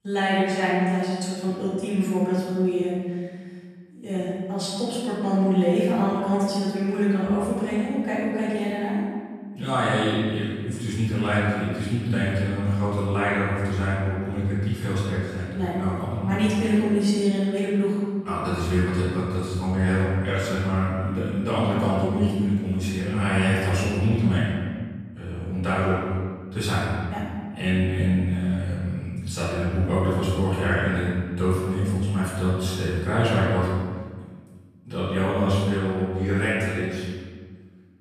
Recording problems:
room echo; strong; dies away in 1.6 s
off-mic speech; far

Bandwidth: 14 kHz